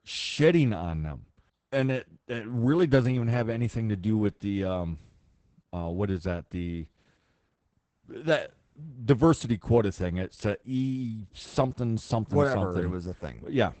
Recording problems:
garbled, watery; badly; nothing above 8 kHz

